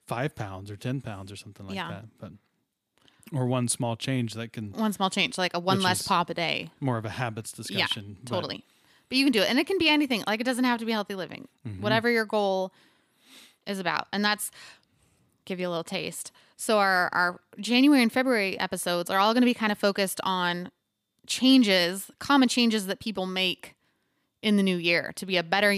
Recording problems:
abrupt cut into speech; at the end

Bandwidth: 15 kHz